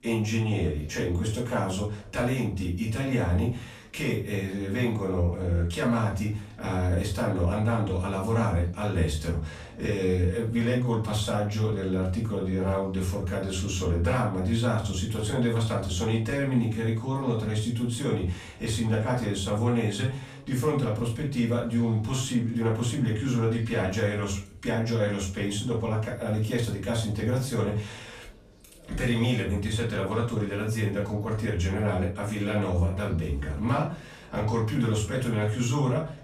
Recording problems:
off-mic speech; far
room echo; slight; dies away in 0.3 s
background chatter; faint; throughout; 4 voices, 25 dB below the speech

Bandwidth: 14 kHz